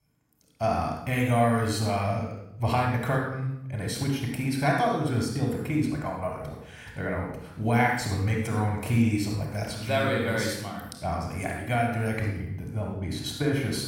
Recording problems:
room echo; noticeable; dies away in 0.7 s
off-mic speech; somewhat distant

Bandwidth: 16.5 kHz